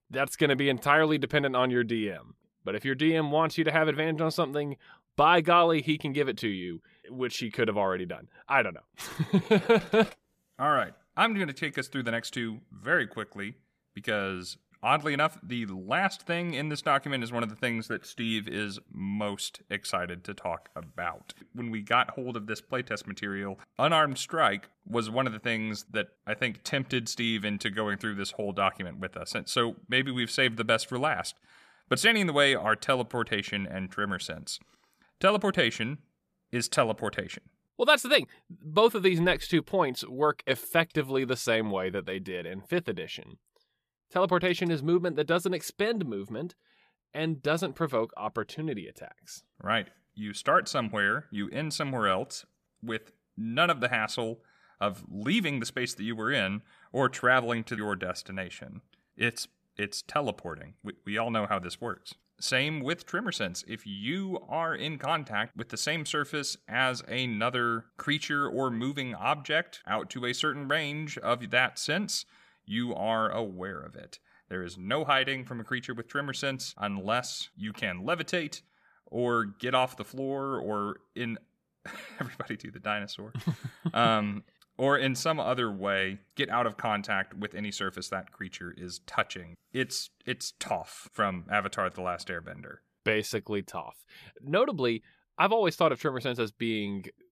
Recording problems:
none

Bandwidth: 14.5 kHz